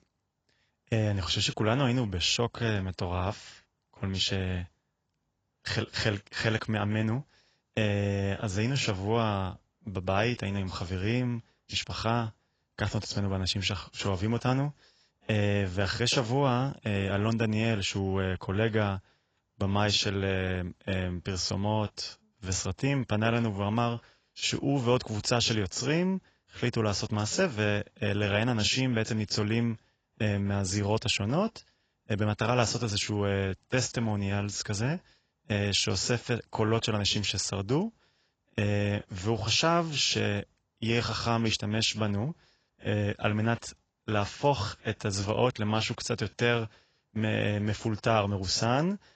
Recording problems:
garbled, watery; badly; nothing above 7.5 kHz

